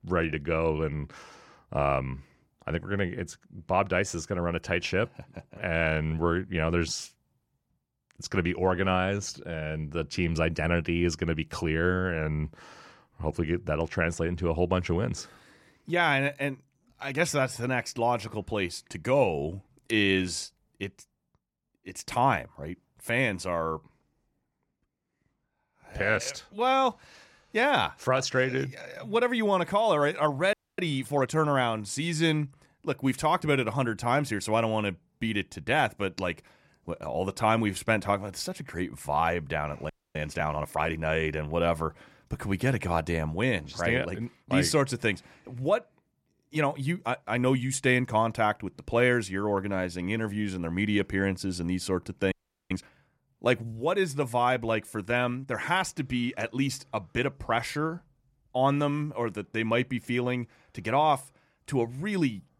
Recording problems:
audio freezing; at 31 s, at 40 s and at 52 s

